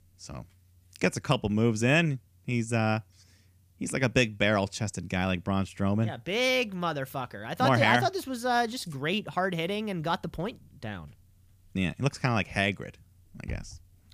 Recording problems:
none

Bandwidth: 15 kHz